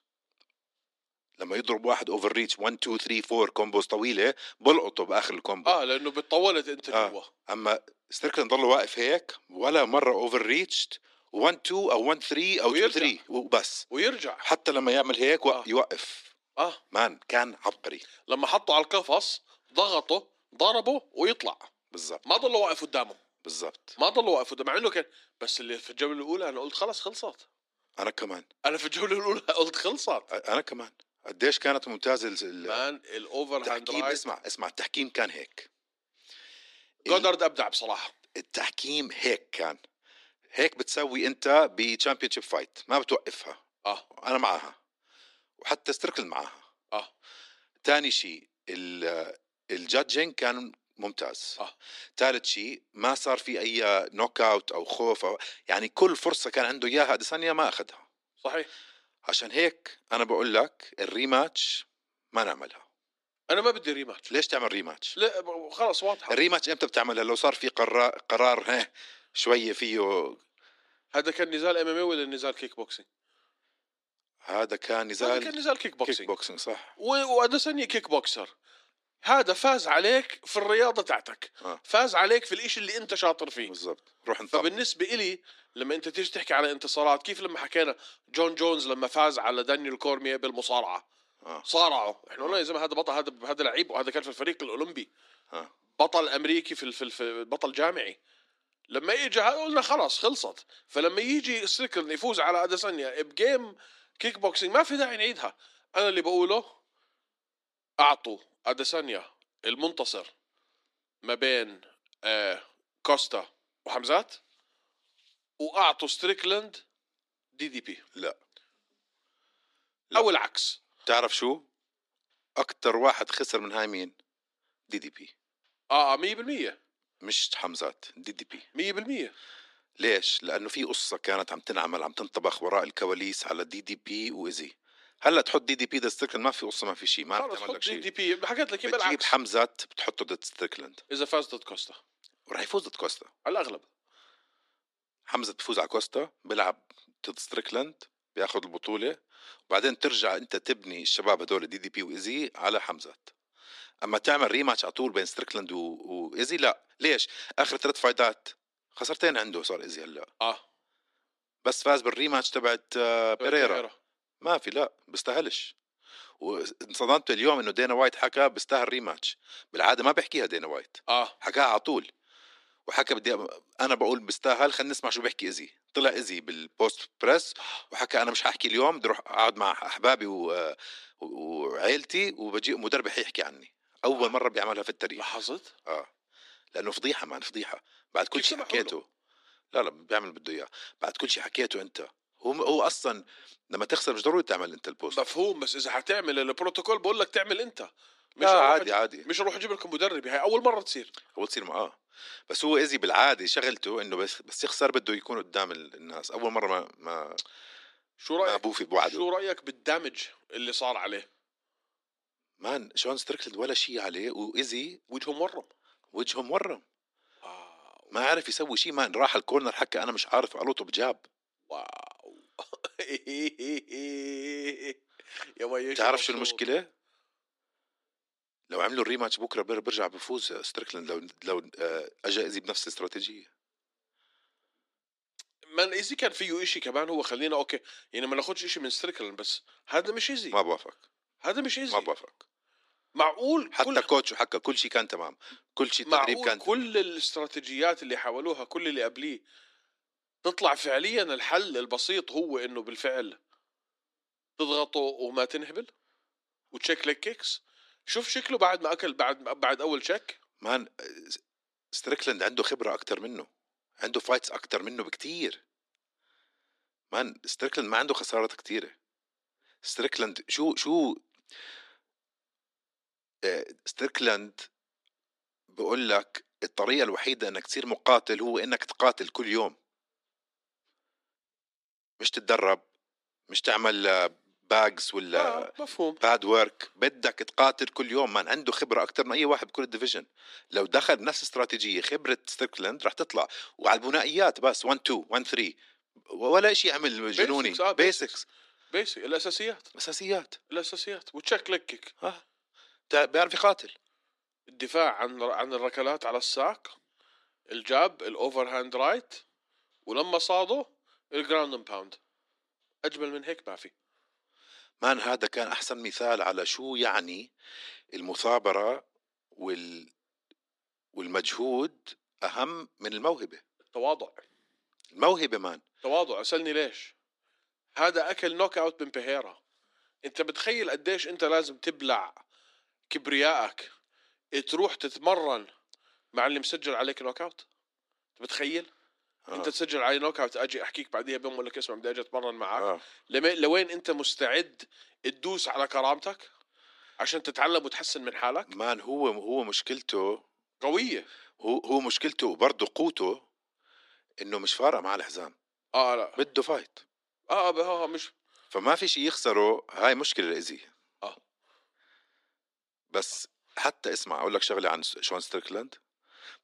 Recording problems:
thin; somewhat; fading below 300 Hz

